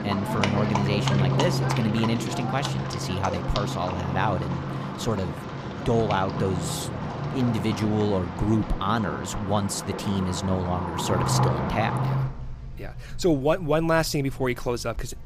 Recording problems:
animal sounds; loud; throughout; 2 dB below the speech

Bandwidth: 15 kHz